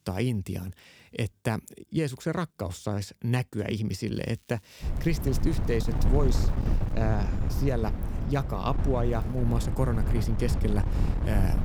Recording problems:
wind noise on the microphone; heavy; from 5 s on; 6 dB below the speech
crackling; faint; from 4 to 7 s and at 9 s; 30 dB below the speech

